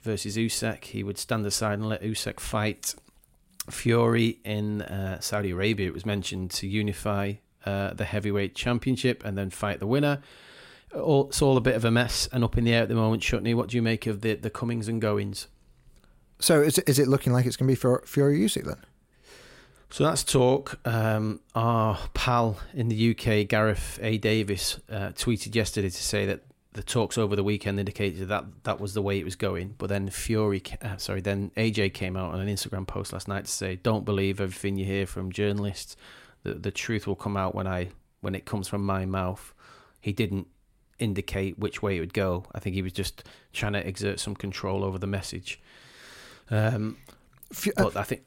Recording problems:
none

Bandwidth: 16 kHz